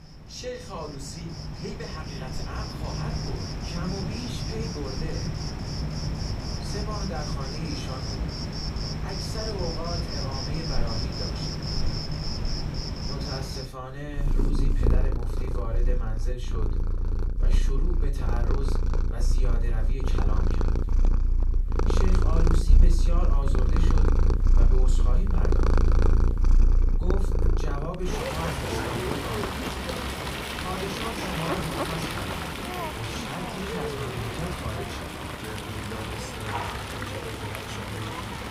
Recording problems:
off-mic speech; far
room echo; very slight; dies away in 0.3 s
animal sounds; very loud; throughout; 9 dB above the speech

